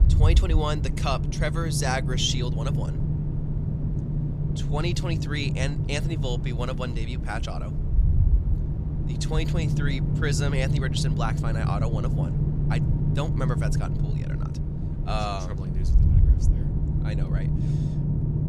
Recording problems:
low rumble; loud; throughout; 6 dB below the speech

